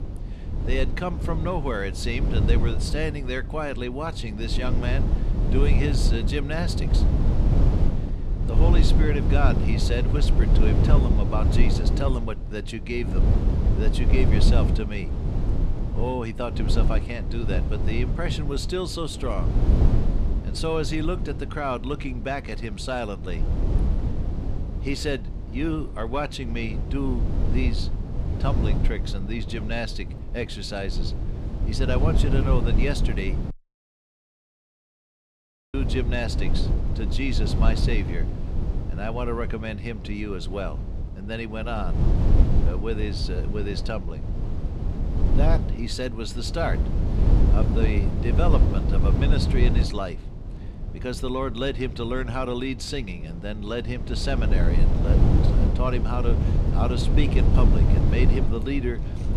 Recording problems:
low rumble; loud; throughout; 5 dB below the speech
audio cutting out; at 34 s for 2 s

